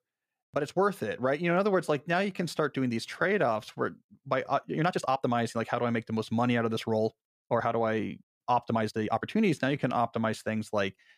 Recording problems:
uneven, jittery; strongly; from 0.5 to 10 s

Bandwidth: 15 kHz